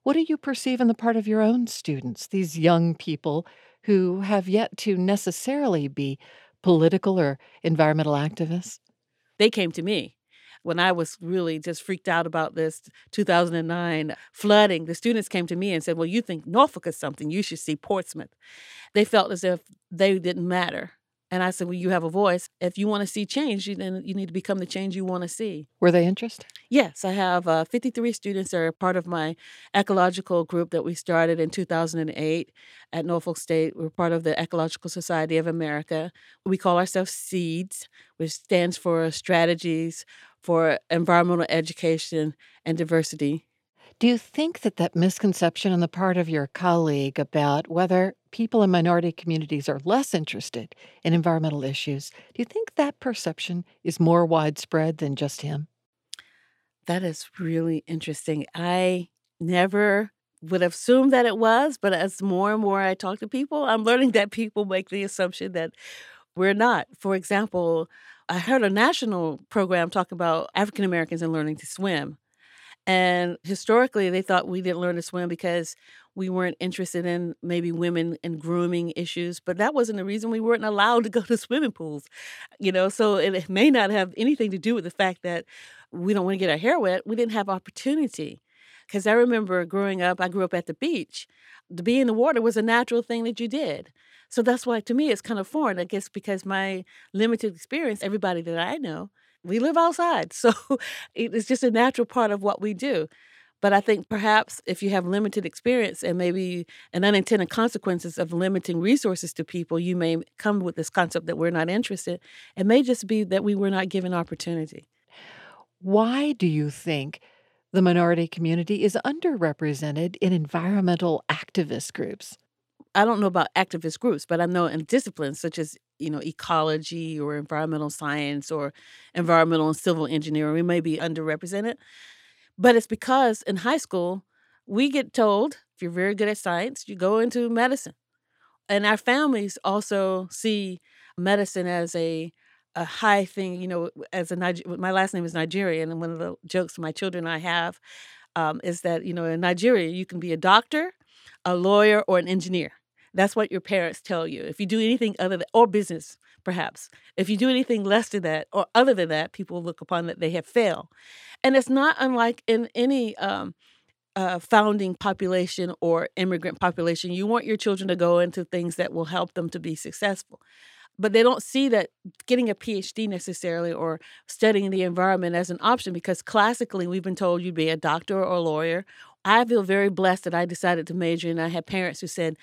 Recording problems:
none

